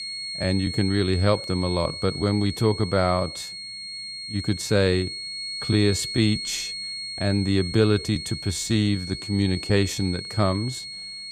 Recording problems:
high-pitched whine; loud; throughout; 4.5 kHz, 7 dB below the speech

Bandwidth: 14.5 kHz